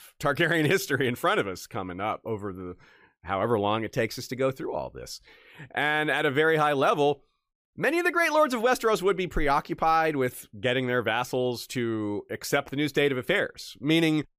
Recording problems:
none

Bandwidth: 15 kHz